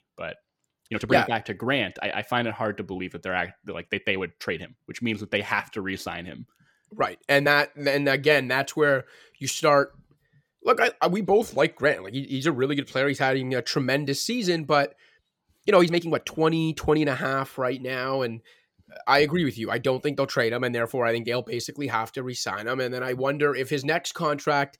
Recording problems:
uneven, jittery; strongly; from 1 to 16 s

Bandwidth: 17 kHz